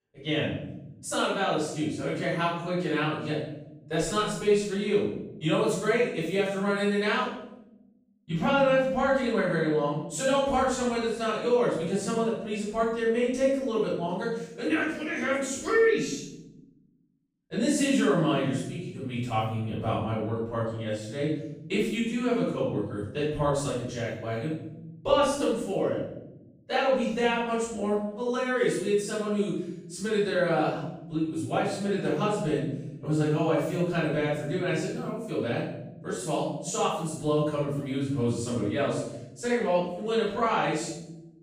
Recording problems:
room echo; strong; dies away in 1 s
off-mic speech; far

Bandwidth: 15 kHz